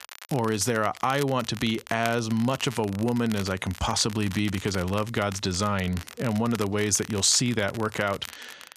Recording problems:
crackle, like an old record; noticeable; 15 dB below the speech

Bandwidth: 14.5 kHz